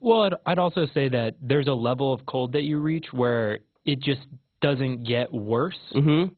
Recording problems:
garbled, watery; badly; nothing above 4 kHz

